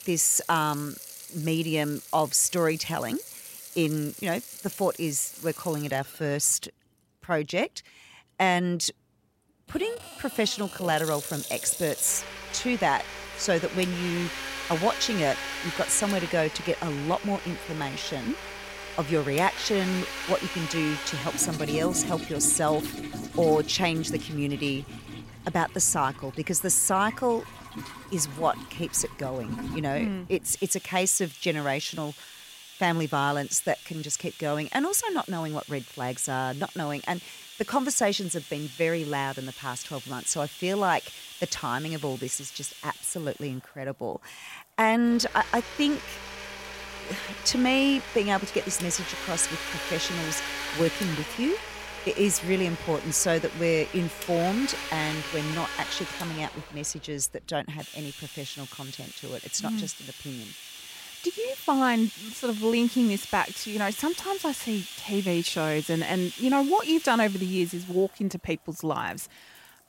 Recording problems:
household noises; loud; throughout; 10 dB below the speech

